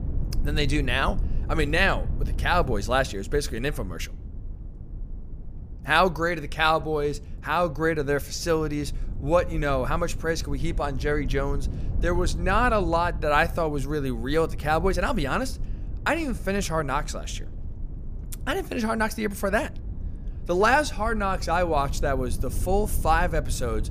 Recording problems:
low rumble; faint; throughout; 25 dB below the speech

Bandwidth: 15 kHz